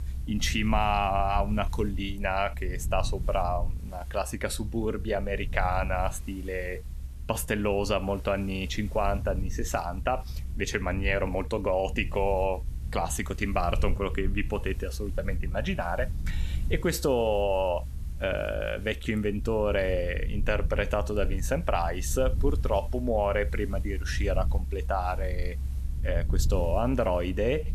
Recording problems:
hiss; faint; throughout; 25 dB below the speech
low rumble; faint; throughout; 20 dB below the speech

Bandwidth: 13.5 kHz